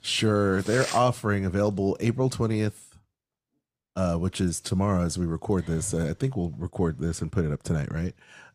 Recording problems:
none

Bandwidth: 14.5 kHz